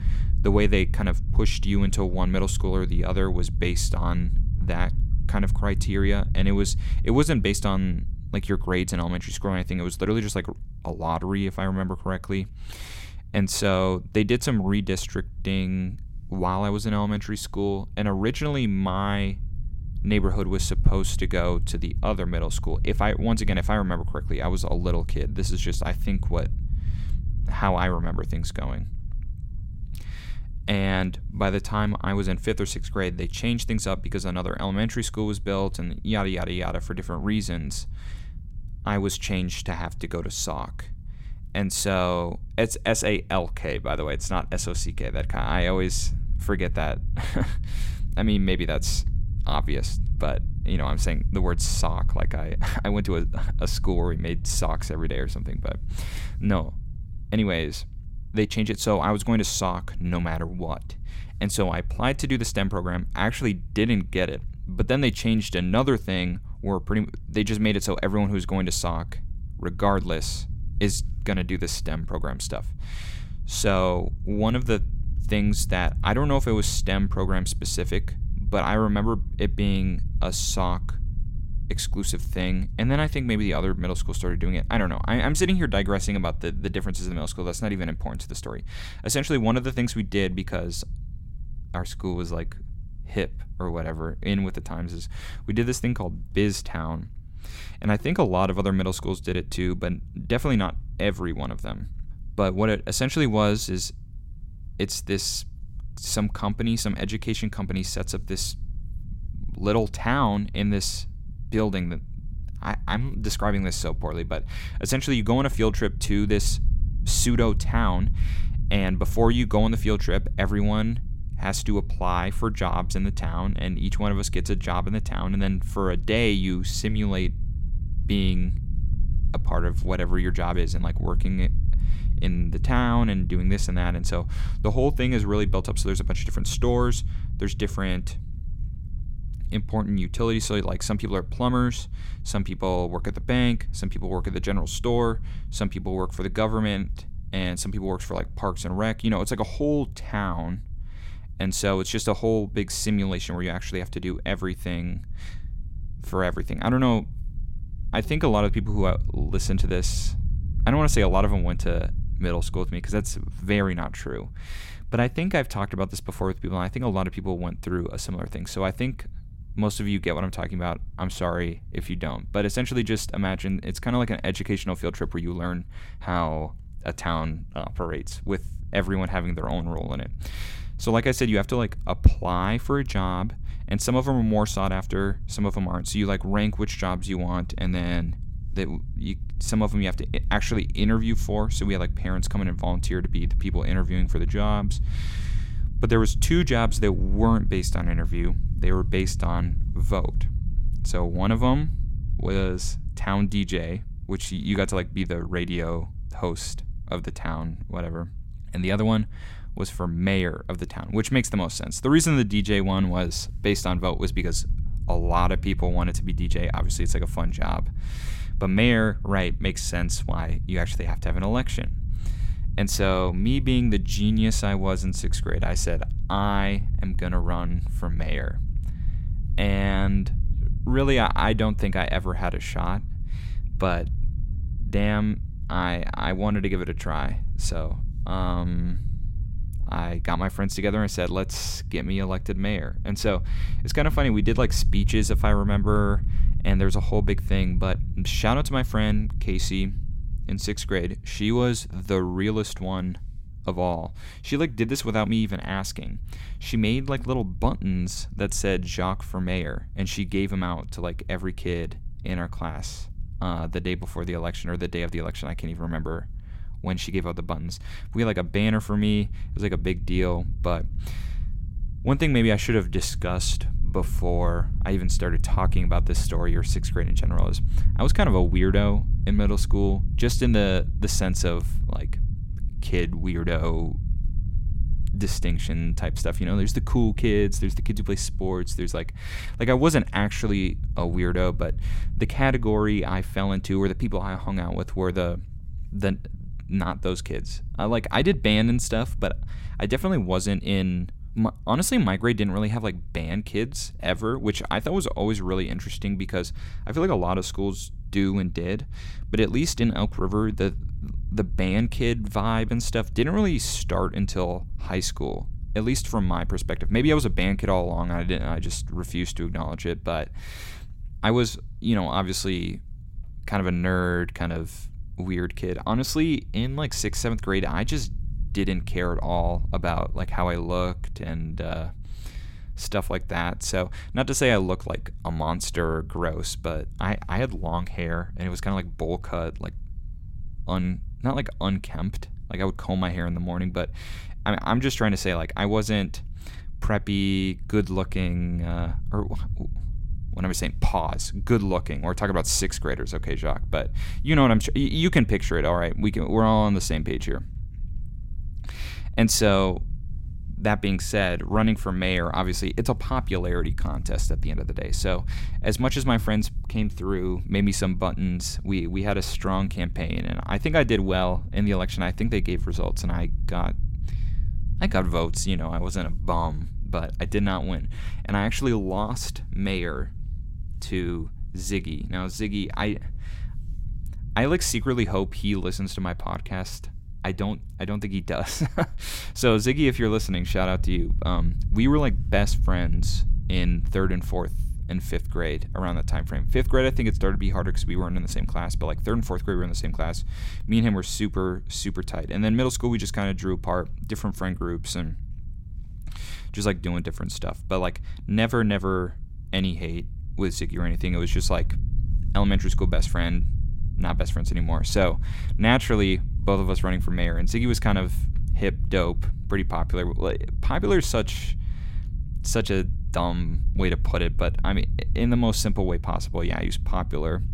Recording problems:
low rumble; faint; throughout; 20 dB below the speech

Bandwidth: 16 kHz